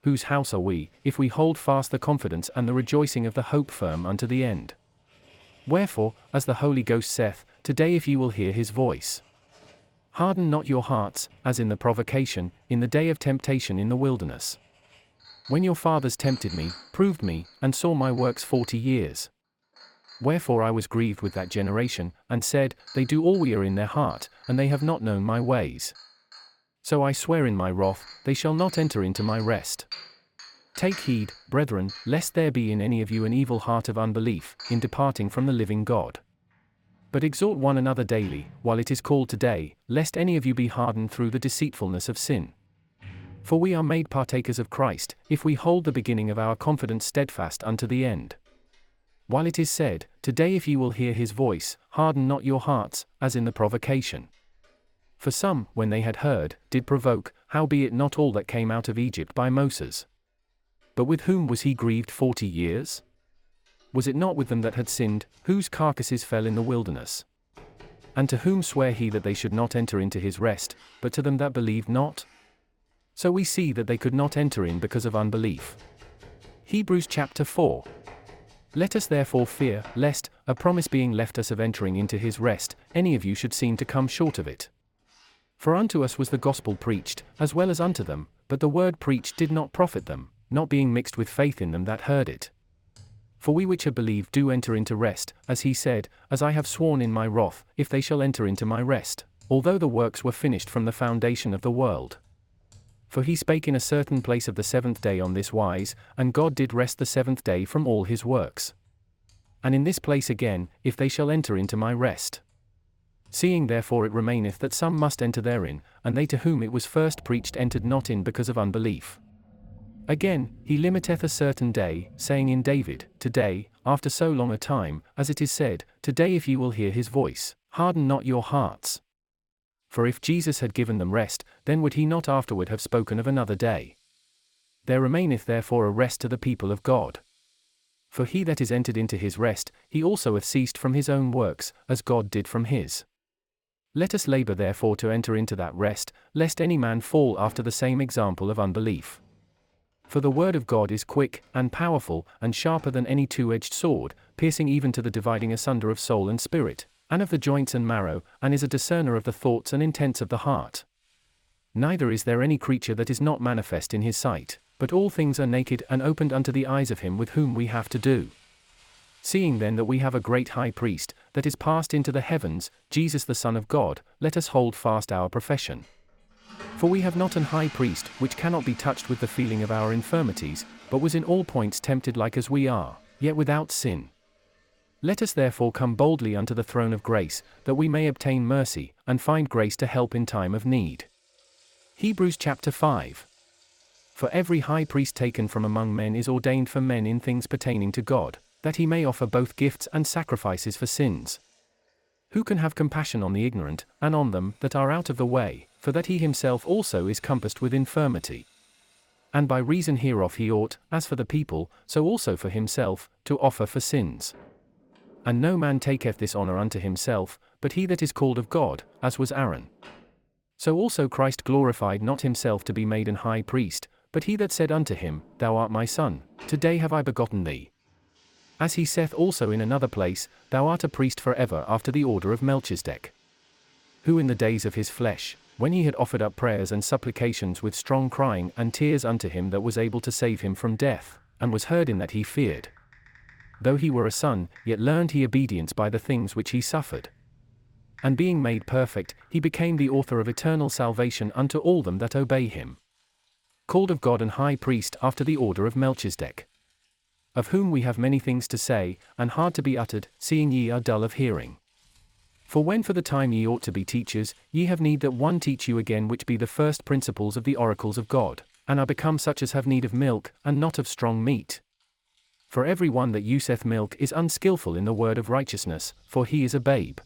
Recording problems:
household noises; faint; throughout; 25 dB below the speech

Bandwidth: 17 kHz